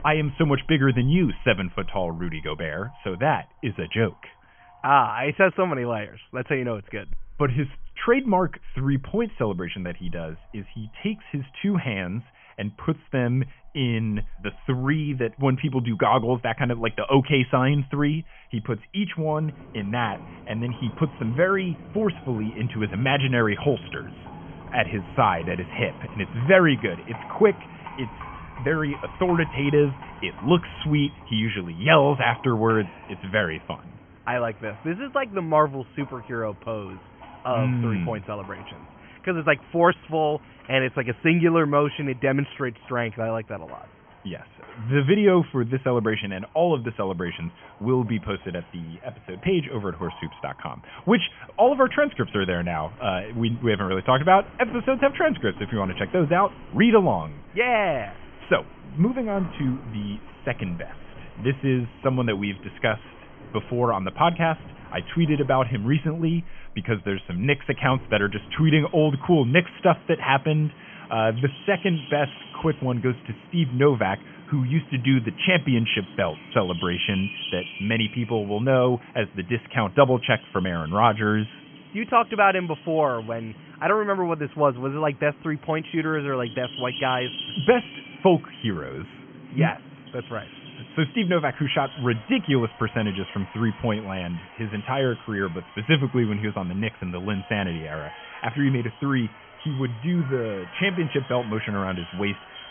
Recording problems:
high frequencies cut off; severe; nothing above 3.5 kHz
animal sounds; noticeable; throughout; 20 dB below the speech

